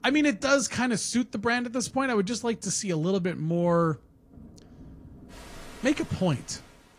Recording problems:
garbled, watery; slightly
rain or running water; faint; throughout; 25 dB below the speech

